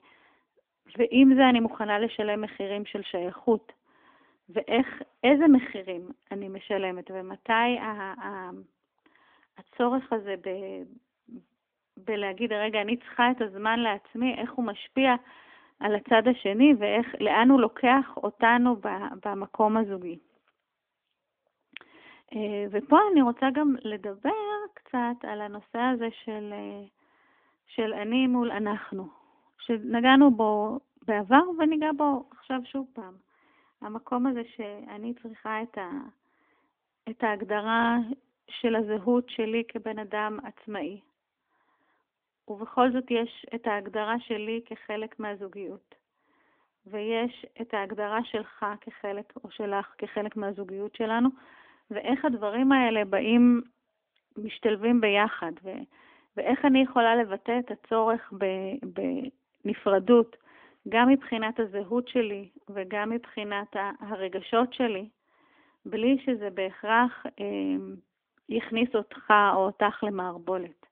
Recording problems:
phone-call audio; nothing above 3.5 kHz

